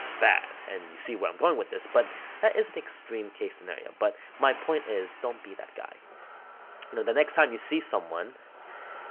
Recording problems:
phone-call audio
traffic noise; noticeable; throughout; 15 dB below the speech

